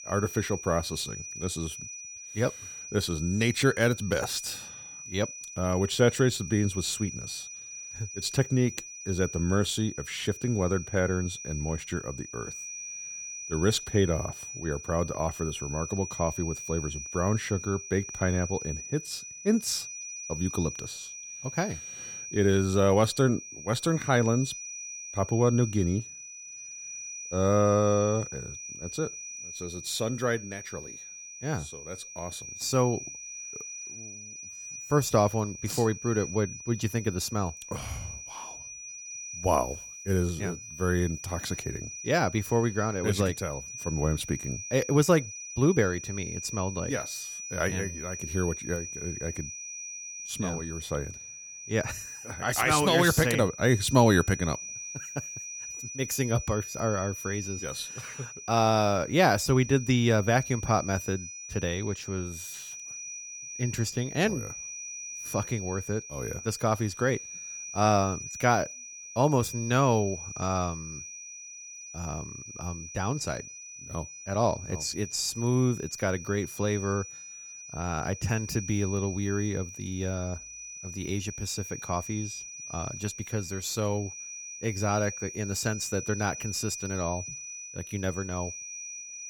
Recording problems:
high-pitched whine; loud; throughout; 6 kHz, 10 dB below the speech

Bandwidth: 18 kHz